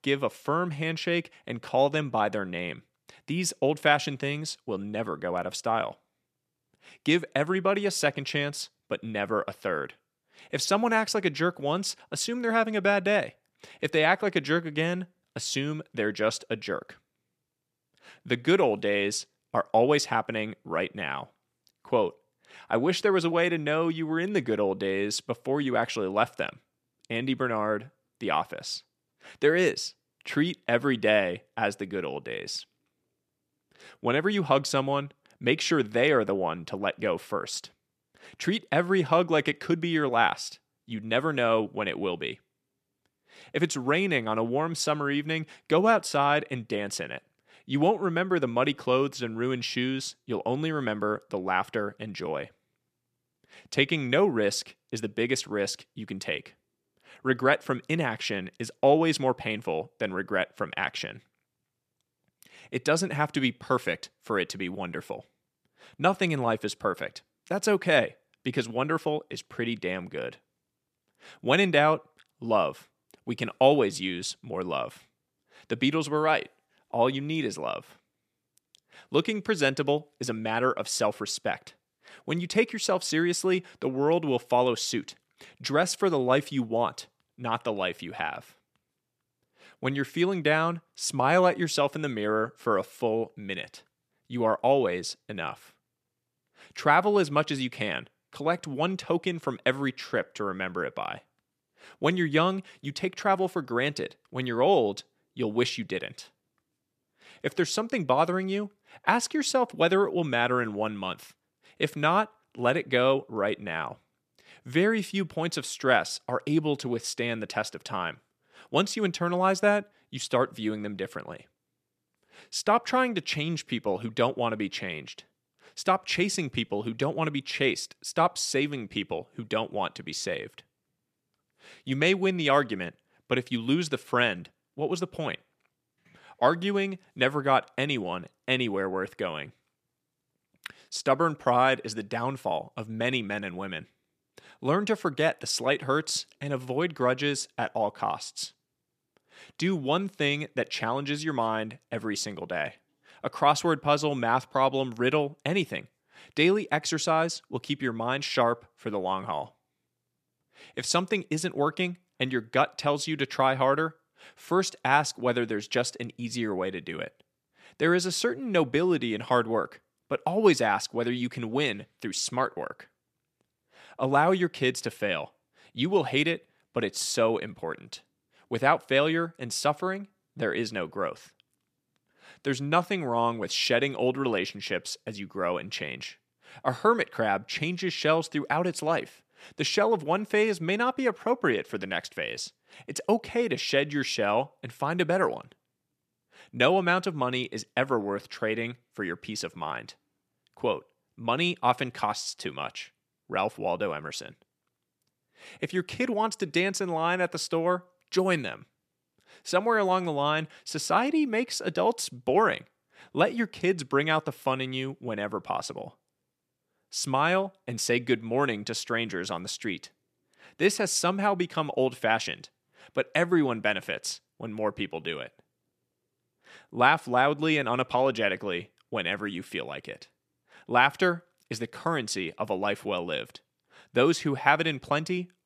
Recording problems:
none

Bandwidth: 14.5 kHz